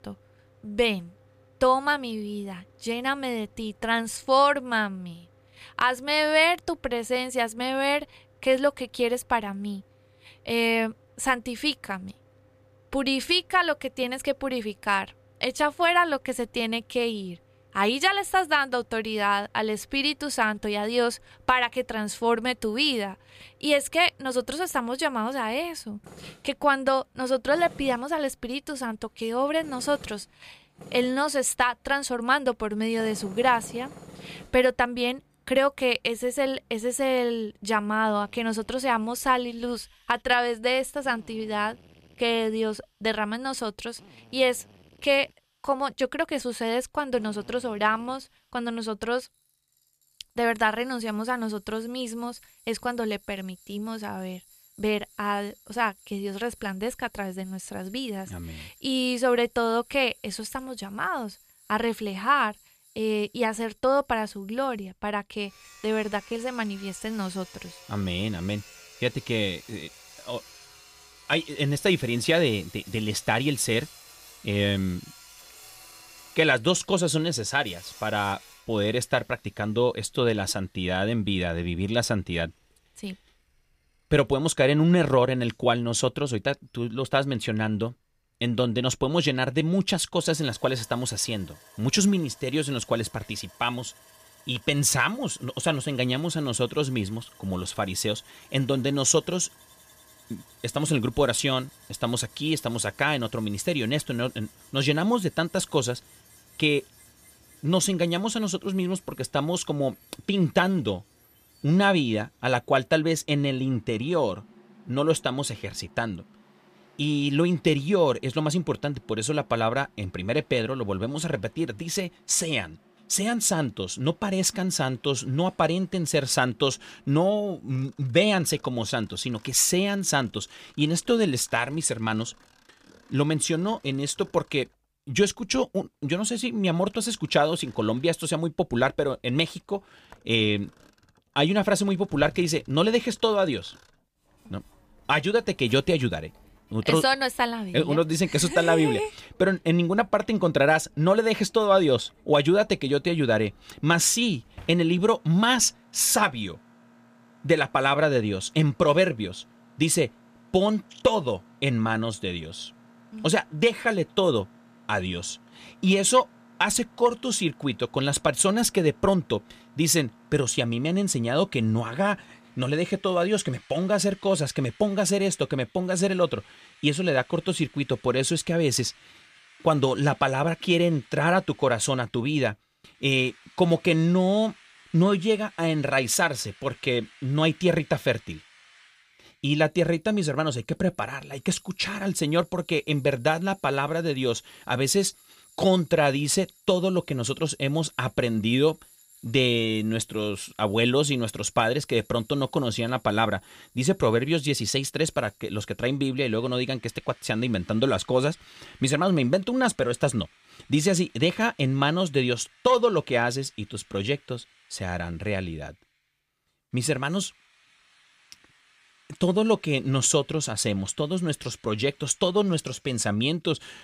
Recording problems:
machinery noise; faint; throughout; 30 dB below the speech

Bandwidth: 15 kHz